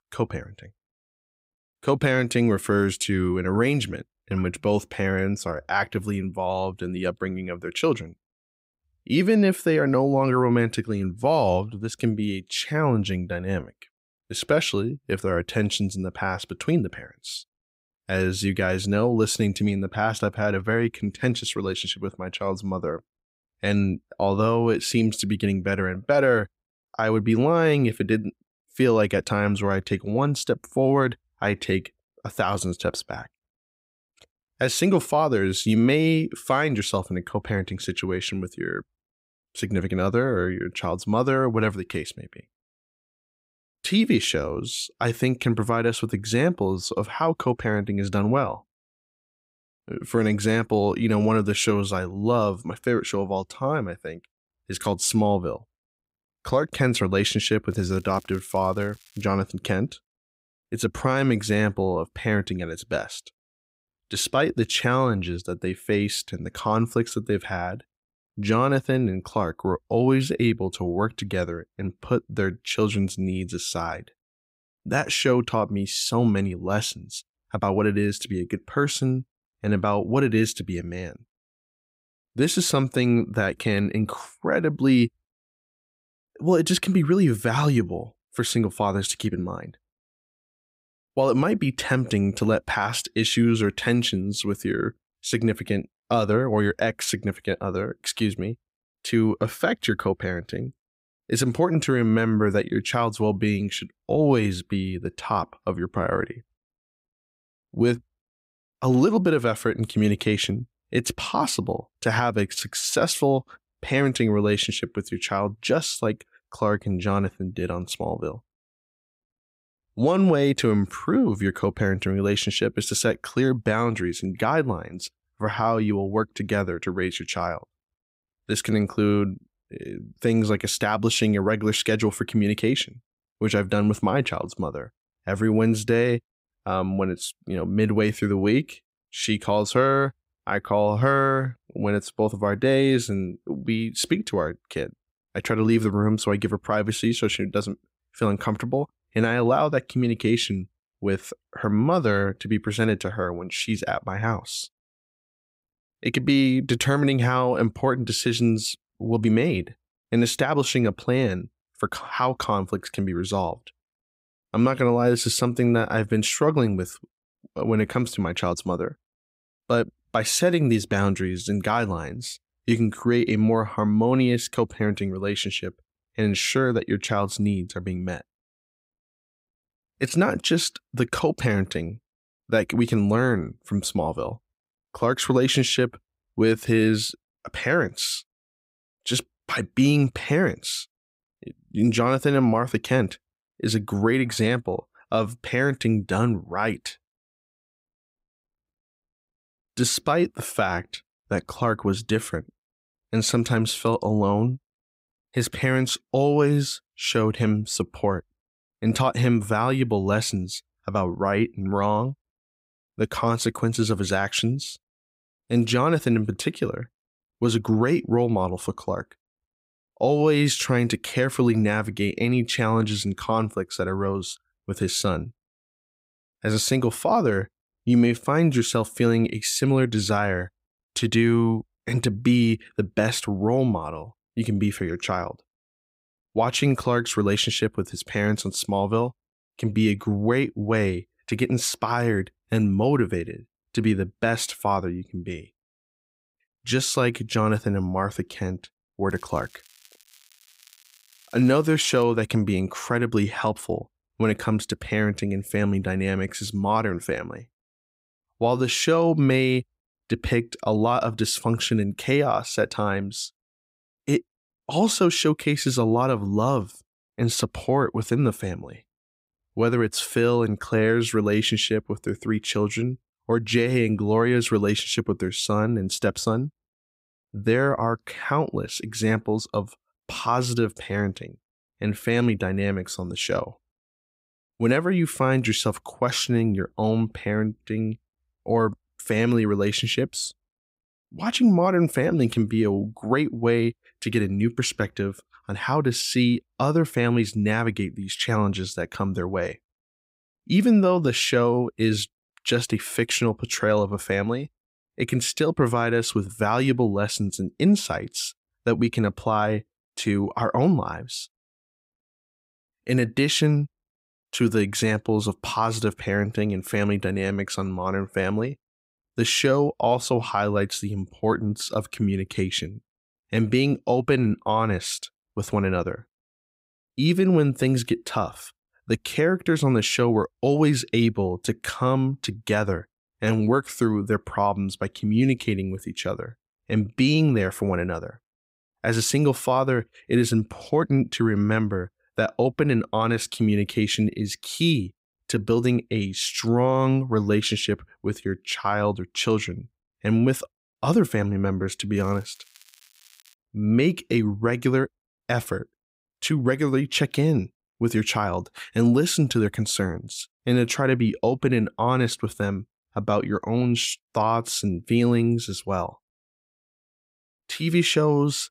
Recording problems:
crackling; faint; from 58 to 59 s, from 4:09 to 4:12 and from 5:52 to 5:53; 30 dB below the speech

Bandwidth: 15.5 kHz